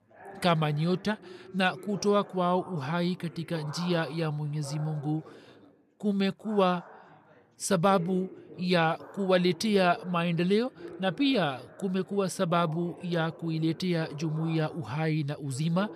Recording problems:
background chatter; noticeable; throughout; 4 voices, 20 dB below the speech

